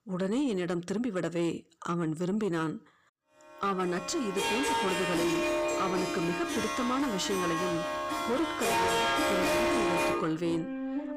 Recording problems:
distortion; heavy; 7 dB below the speech
background music; very loud; from 4 s on; 2 dB above the speech

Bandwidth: 15 kHz